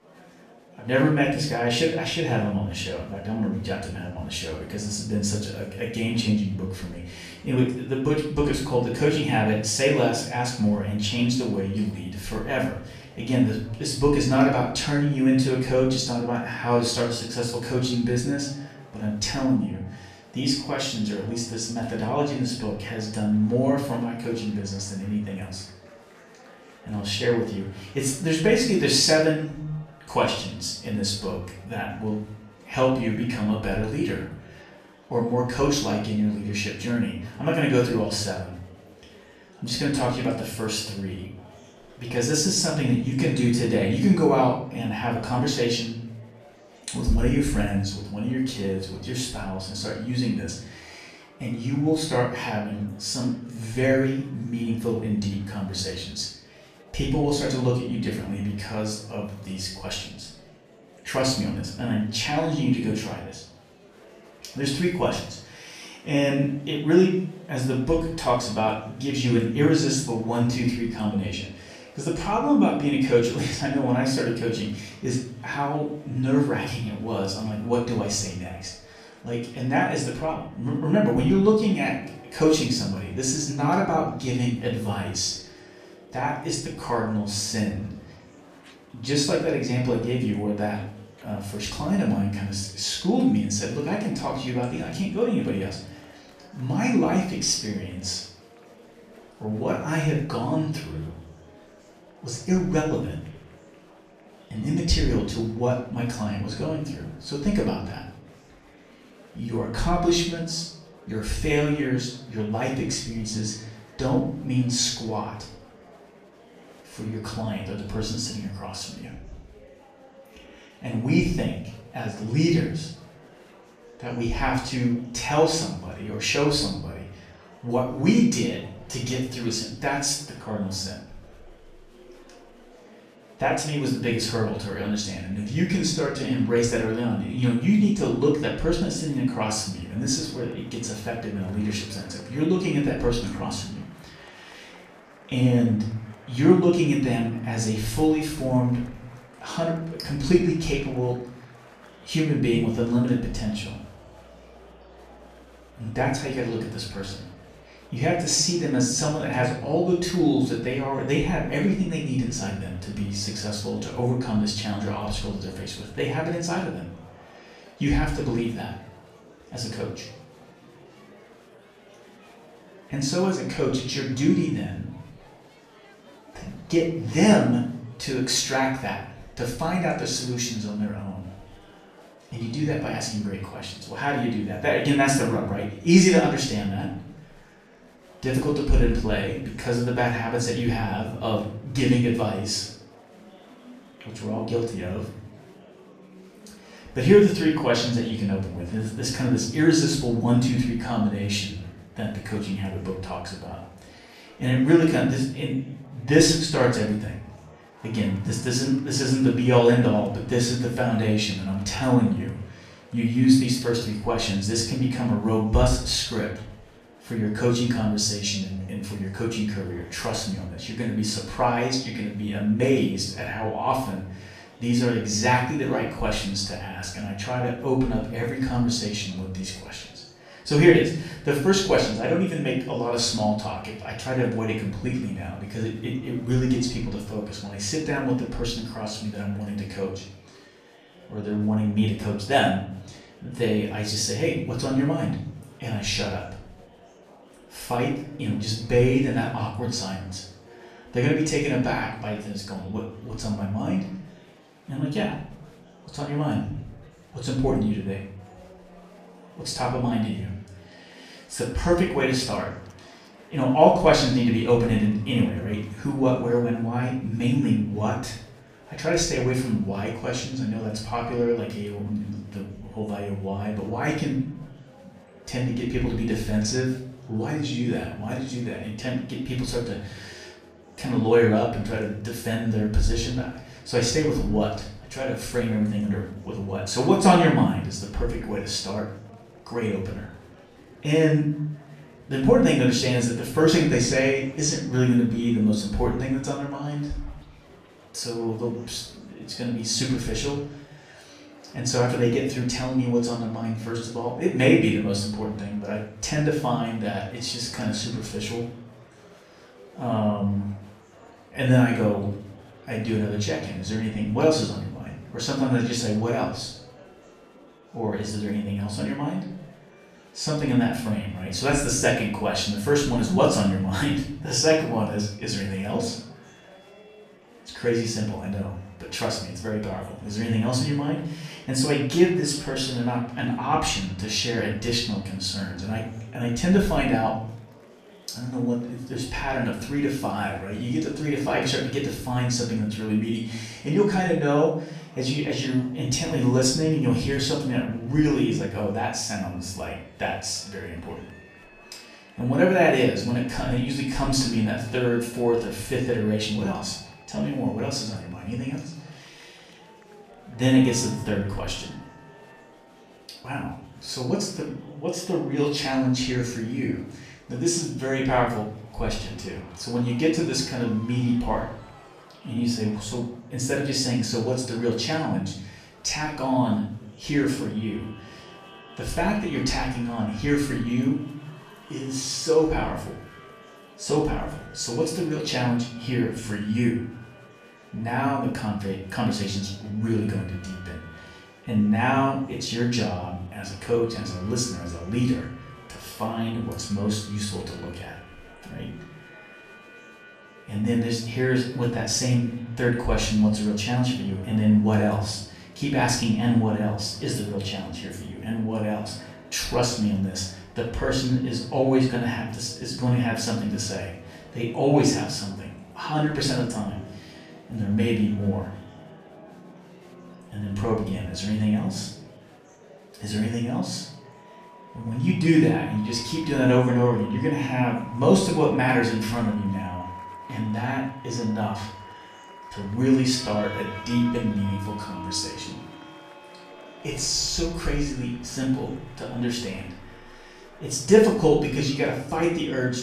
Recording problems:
off-mic speech; far
room echo; noticeable; dies away in 0.5 s
background music; faint; throughout; 25 dB below the speech
murmuring crowd; faint; throughout; 25 dB below the speech

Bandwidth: 14.5 kHz